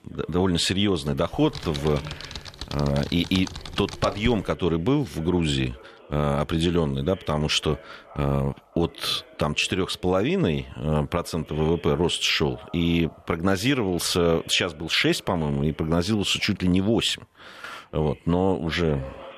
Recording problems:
background chatter; faint; throughout; 2 voices, 25 dB below the speech
keyboard typing; noticeable; from 1.5 to 4.5 s; peak 9 dB below the speech

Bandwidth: 14 kHz